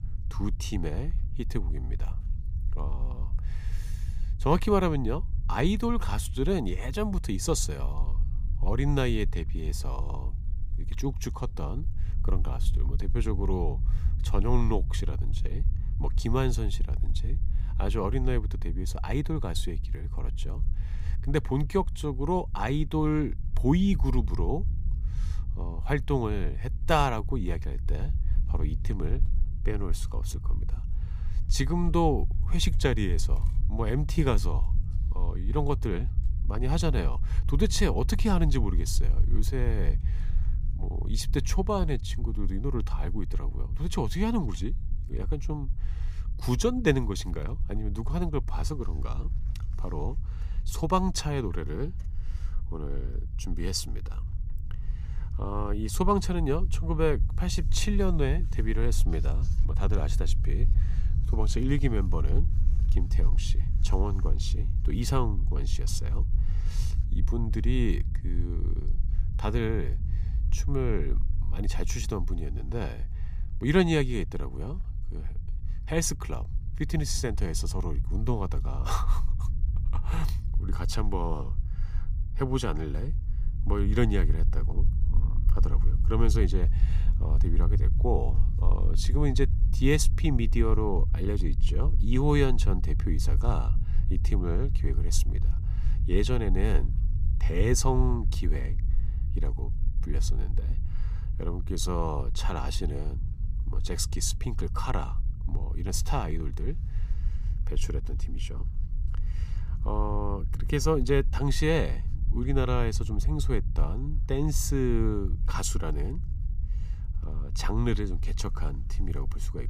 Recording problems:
low rumble; noticeable; throughout; 15 dB below the speech

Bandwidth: 15 kHz